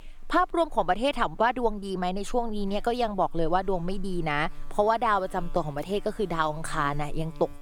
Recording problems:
electrical hum; faint; throughout; 60 Hz, 25 dB below the speech

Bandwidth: 18.5 kHz